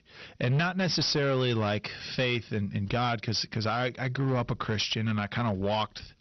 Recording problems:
distortion; slight; 10% of the sound clipped
garbled, watery; slightly; nothing above 6 kHz

